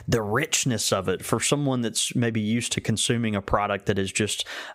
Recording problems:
squashed, flat; somewhat

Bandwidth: 15.5 kHz